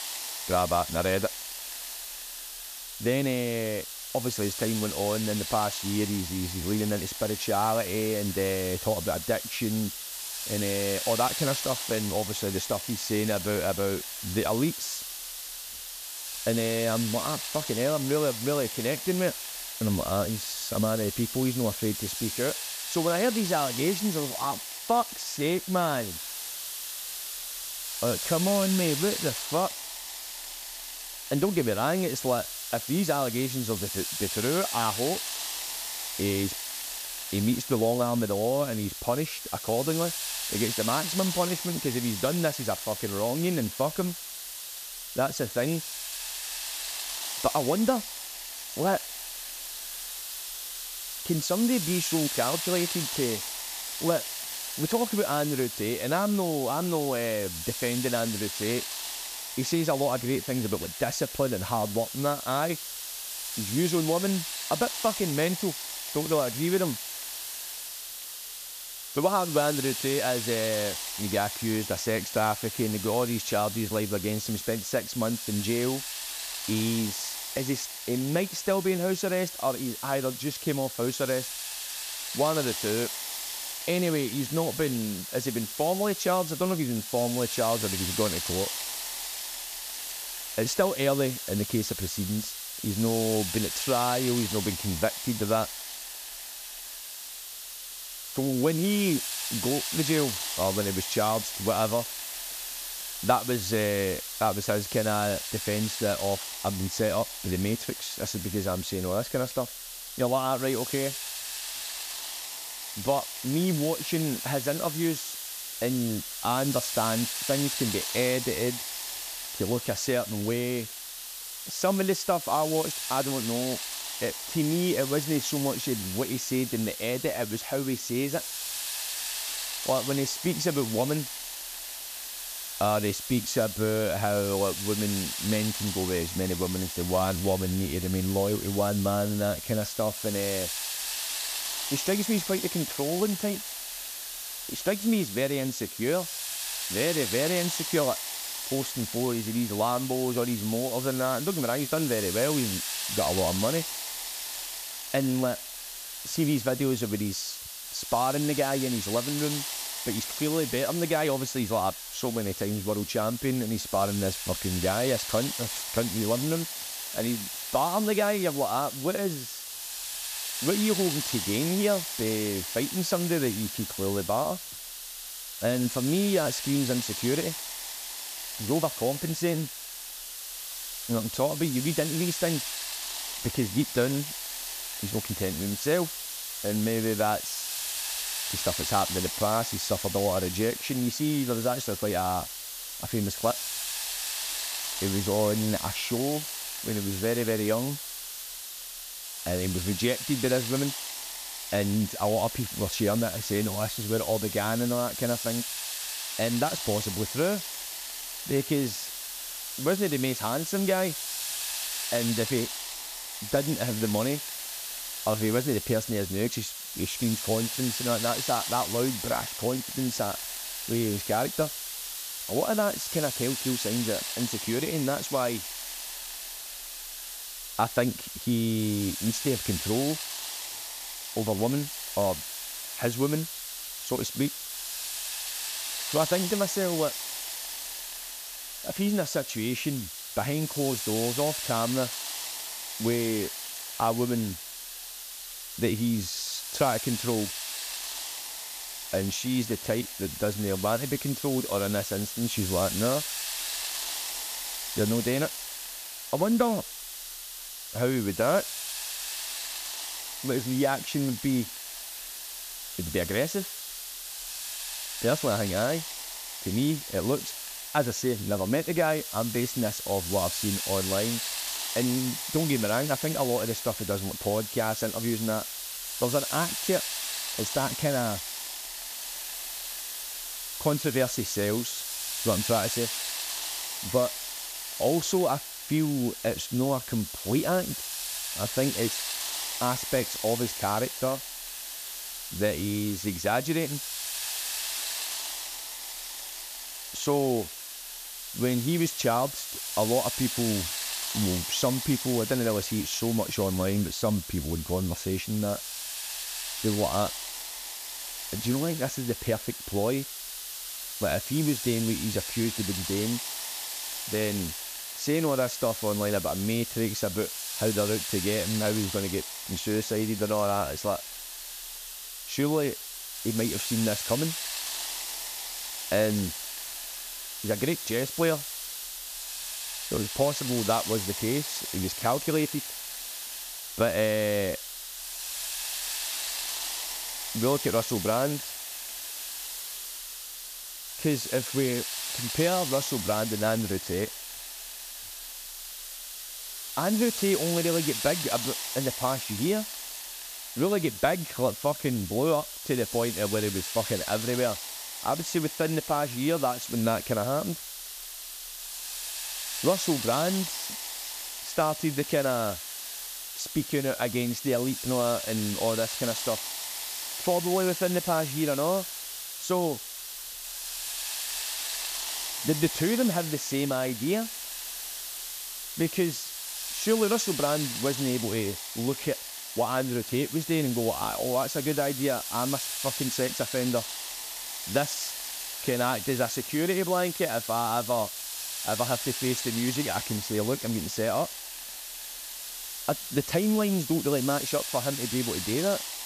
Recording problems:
hiss; loud; throughout; 4 dB below the speech

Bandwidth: 14.5 kHz